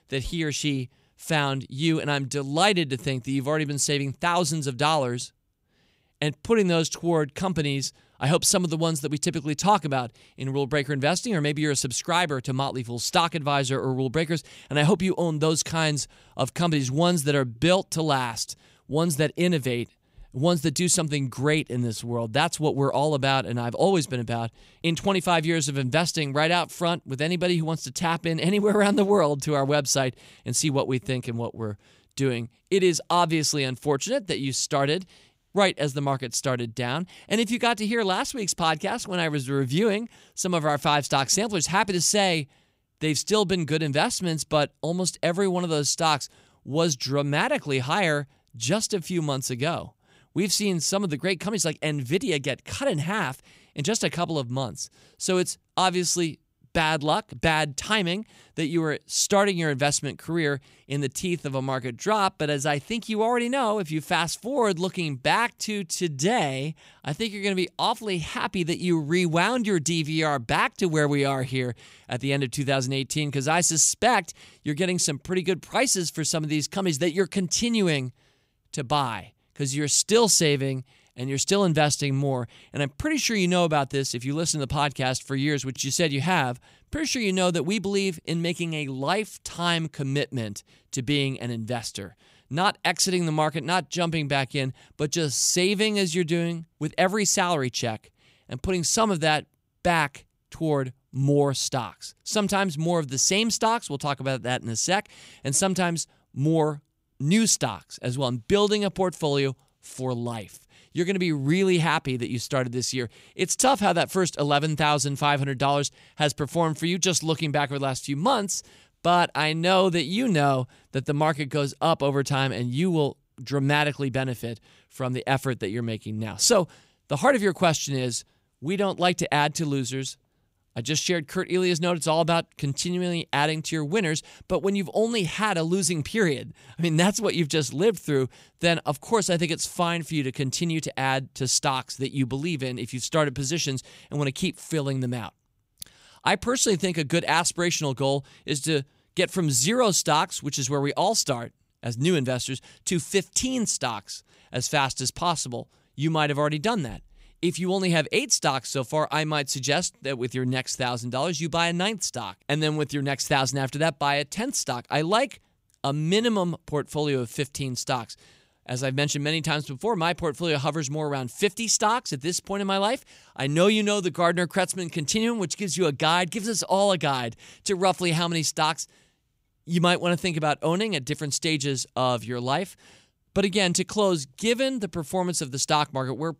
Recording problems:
none

